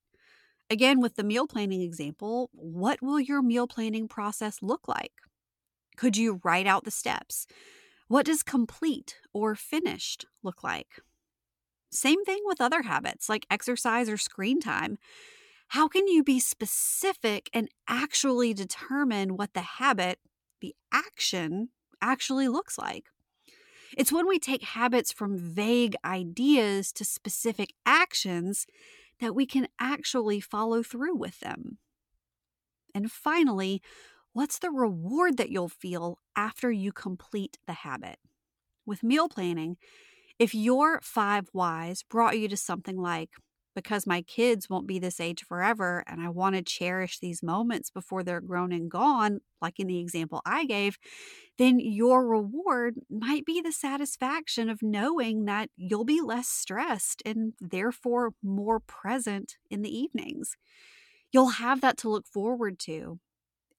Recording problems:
none

